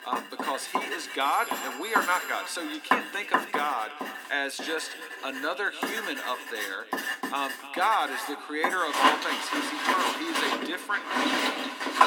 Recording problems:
echo of what is said; noticeable; throughout; 300 ms later, 15 dB below the speech
thin; somewhat; fading below 300 Hz
household noises; very loud; throughout; as loud as the speech
alarms or sirens; noticeable; throughout; 15 dB below the speech

